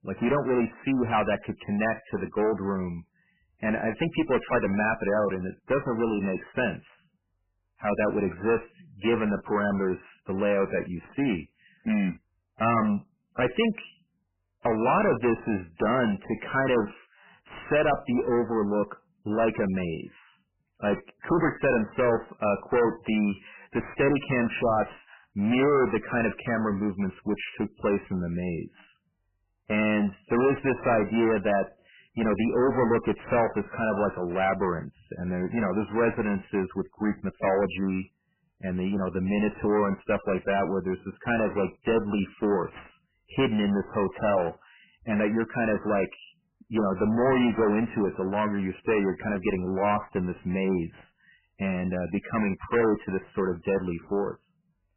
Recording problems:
distortion; heavy; 11% of the sound clipped
garbled, watery; badly; nothing above 3 kHz

